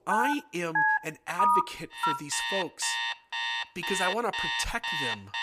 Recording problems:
alarms or sirens; very loud; throughout; 4 dB above the speech

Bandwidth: 15 kHz